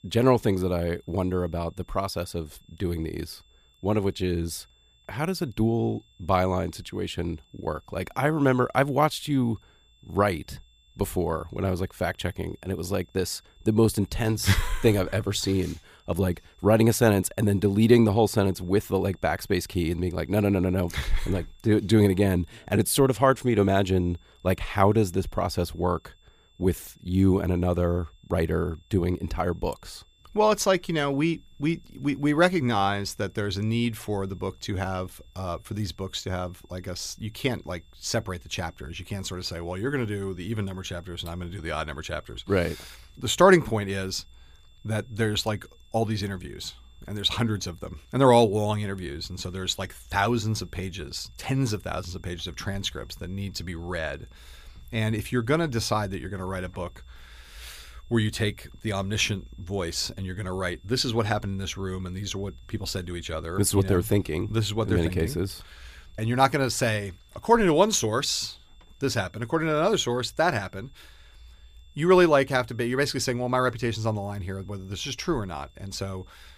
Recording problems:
high-pitched whine; faint; throughout; 3.5 kHz, 35 dB below the speech

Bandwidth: 15 kHz